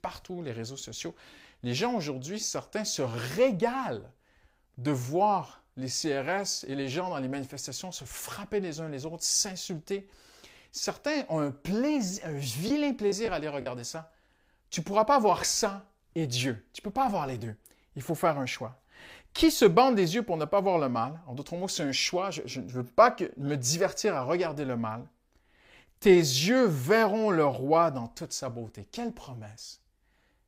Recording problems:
choppy; occasionally; at 13 s; 3% of the speech affected

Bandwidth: 15.5 kHz